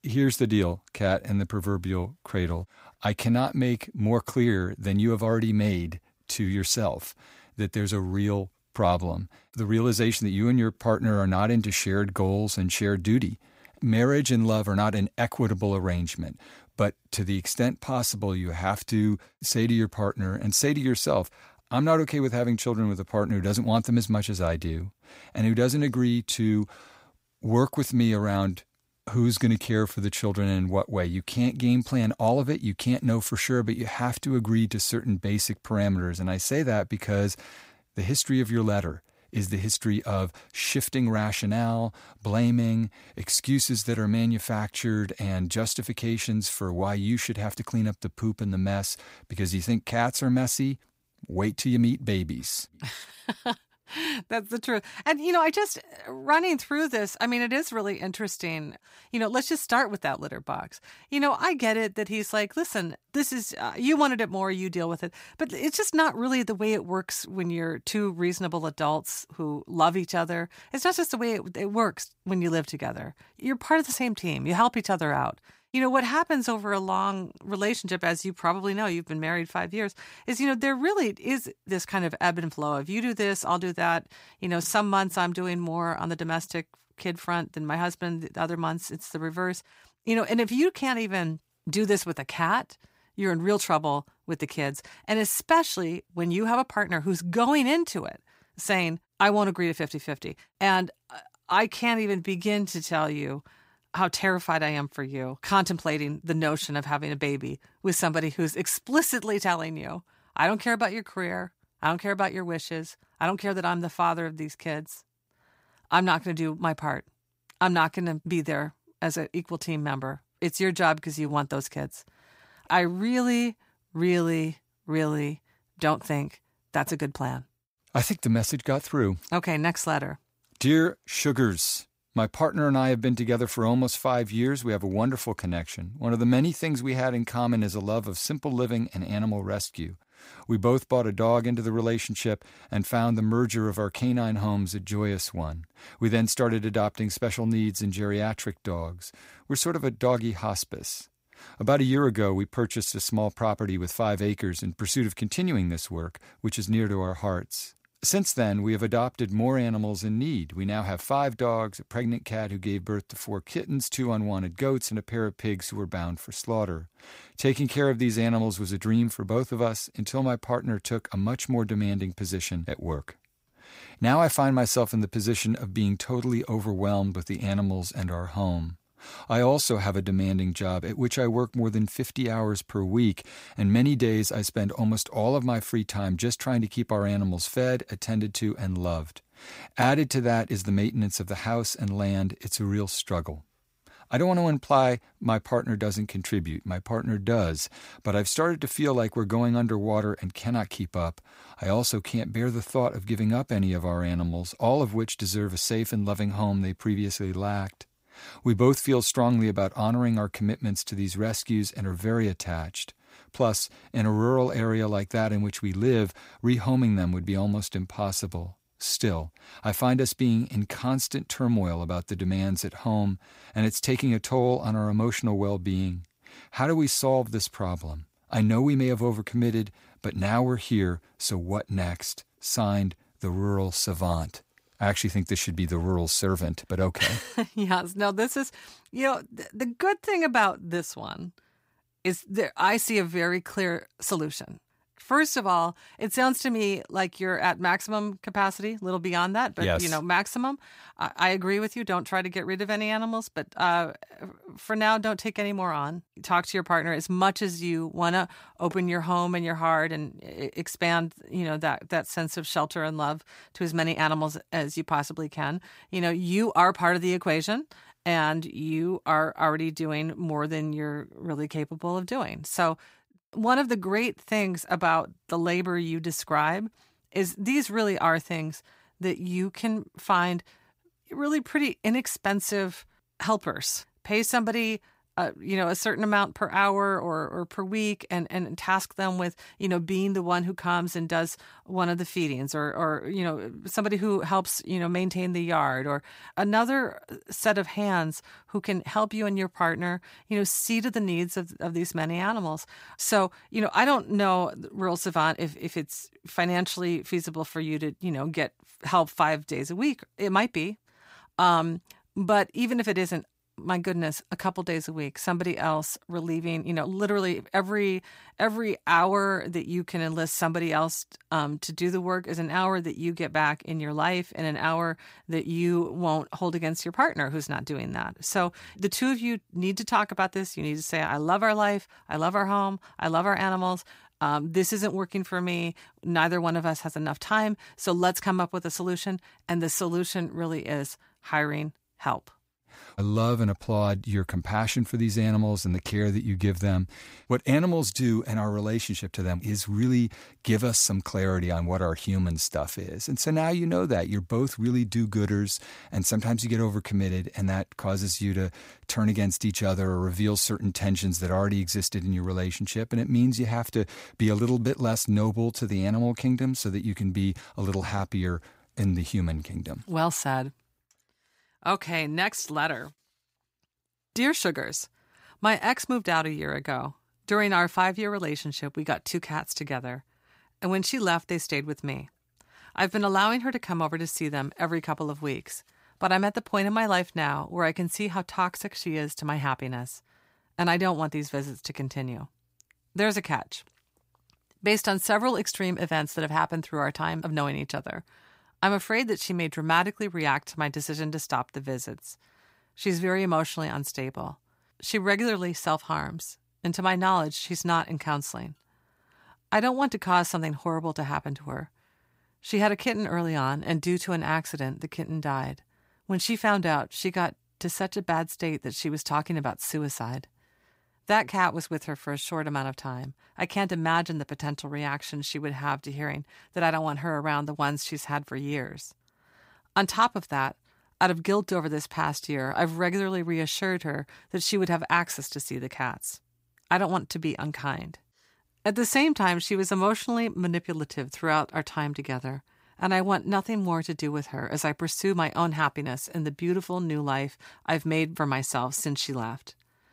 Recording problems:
none

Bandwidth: 15.5 kHz